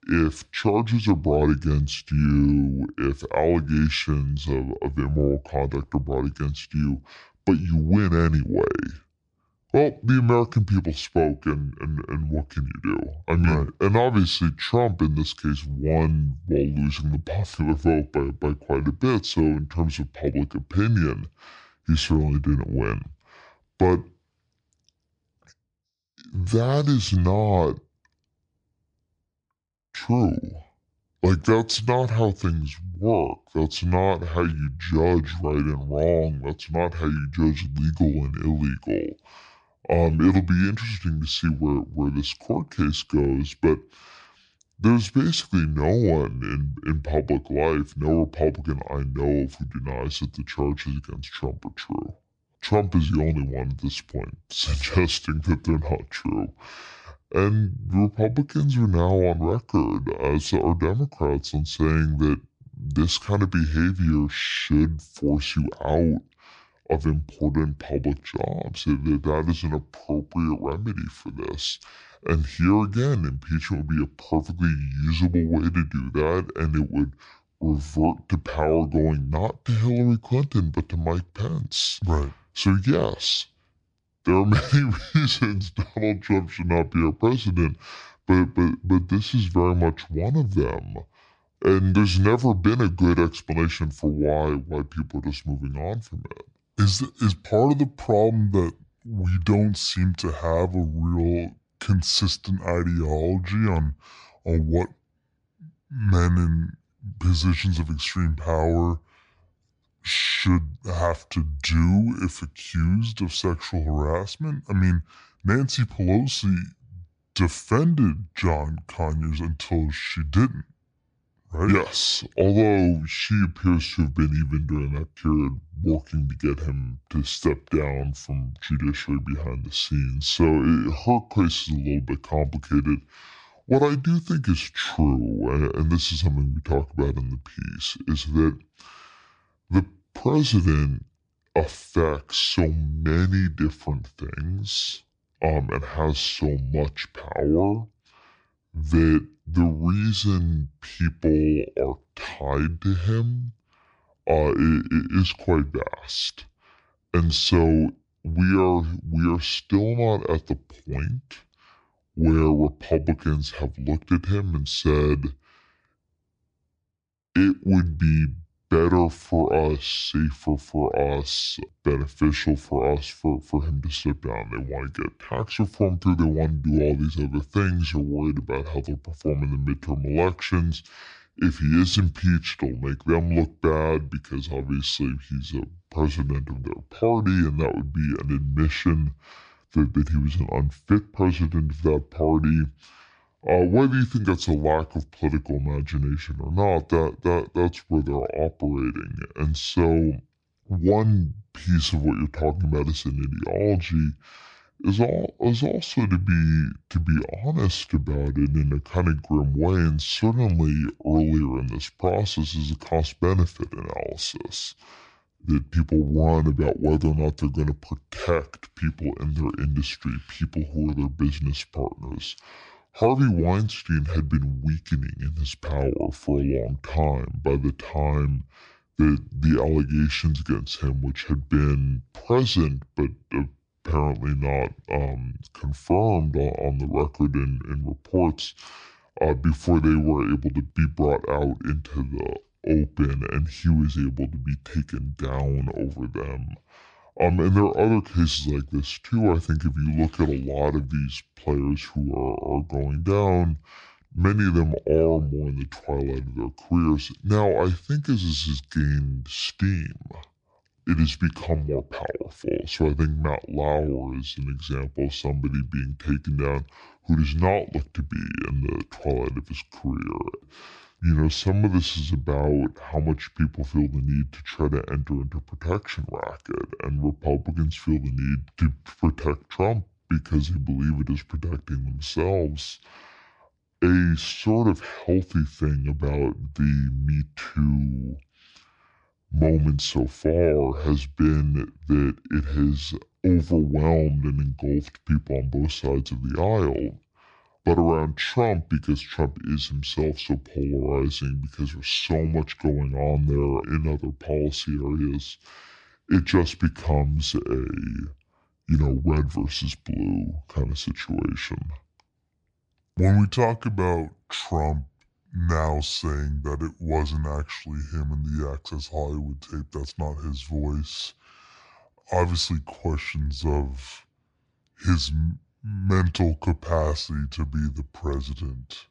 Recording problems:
wrong speed and pitch; too slow and too low; 0.7 times normal speed

